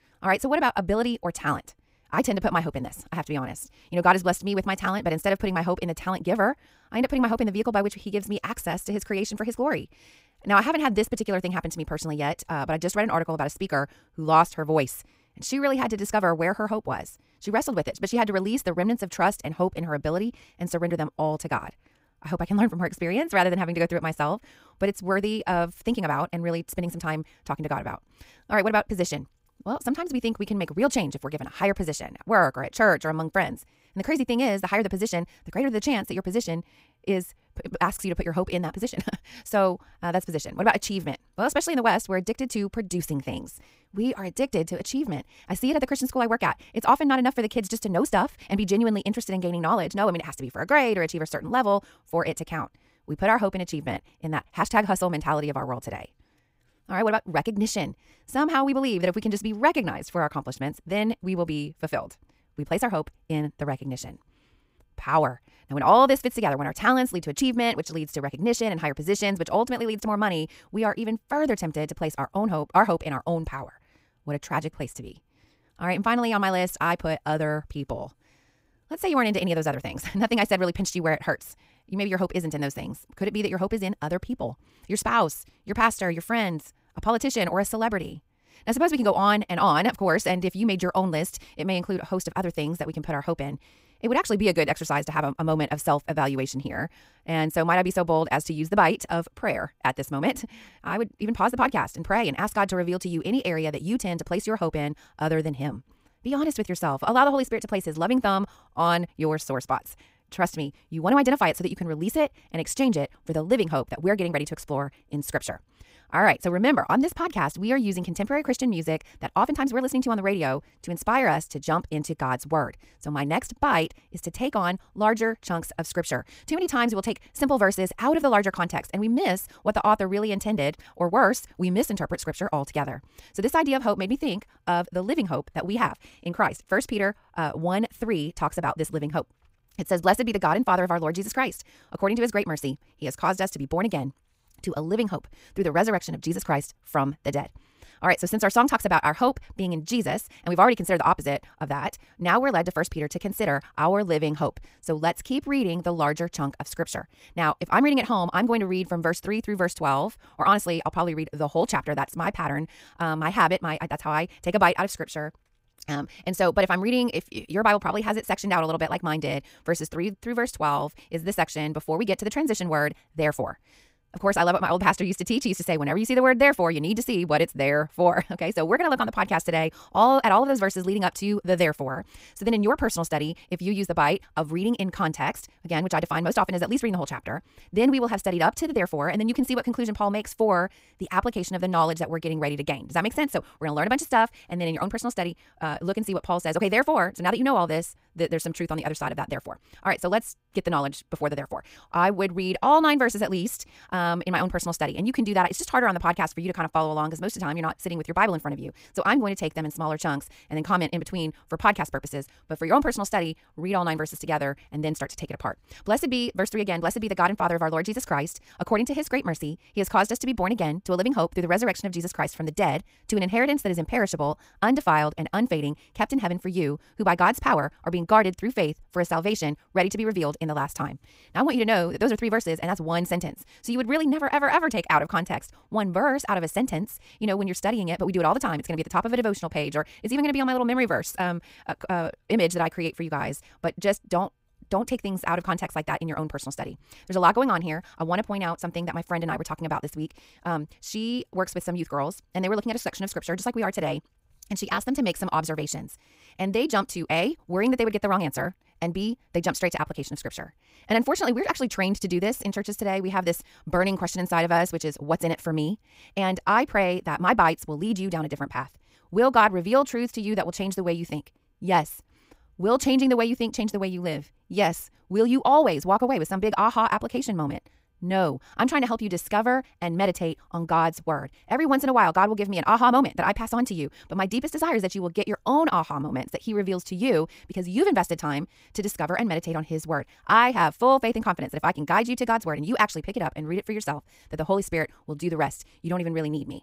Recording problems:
wrong speed, natural pitch; too fast; 1.6 times normal speed

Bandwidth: 15.5 kHz